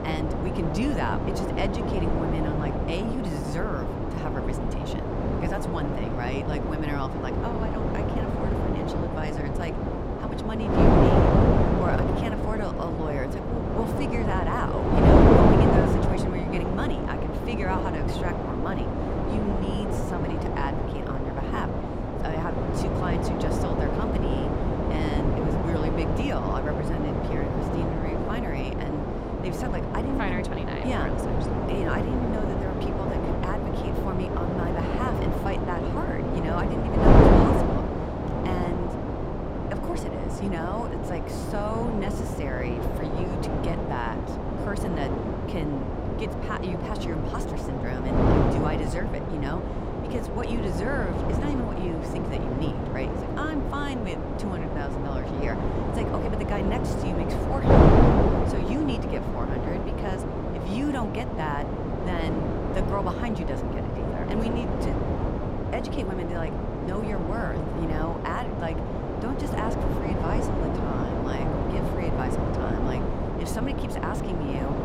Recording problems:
wind noise on the microphone; heavy; 5 dB above the speech

